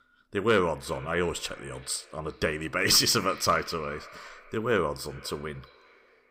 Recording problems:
echo of what is said; faint; throughout; 390 ms later, 20 dB below the speech

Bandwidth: 15.5 kHz